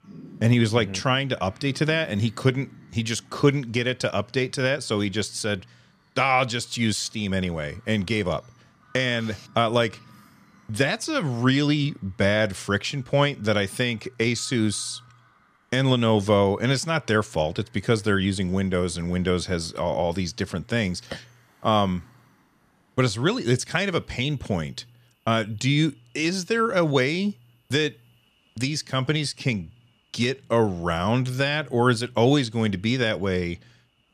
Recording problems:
animal sounds; faint; throughout; 30 dB below the speech

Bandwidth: 14.5 kHz